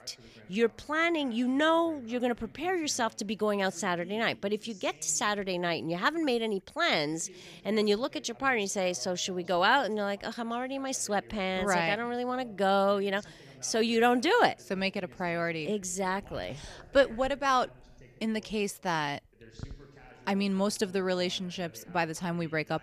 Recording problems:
voice in the background; faint; throughout; 25 dB below the speech

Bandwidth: 15 kHz